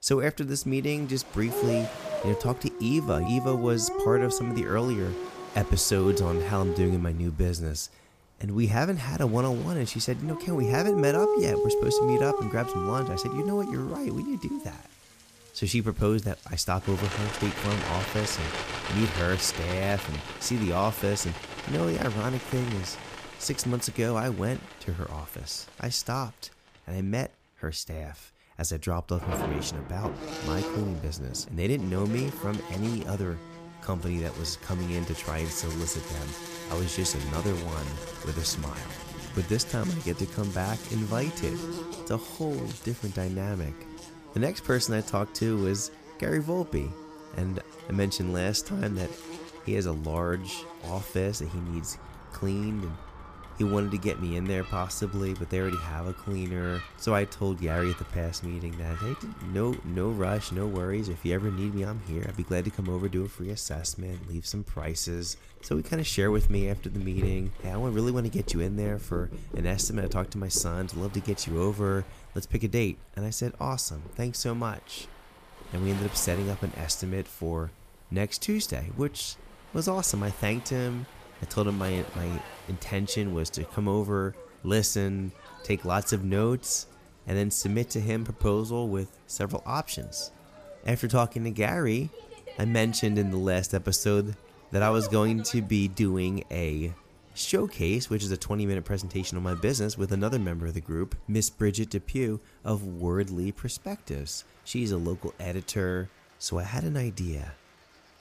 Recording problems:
animal sounds; loud; throughout; 6 dB below the speech
rain or running water; noticeable; throughout; 20 dB below the speech

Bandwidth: 15 kHz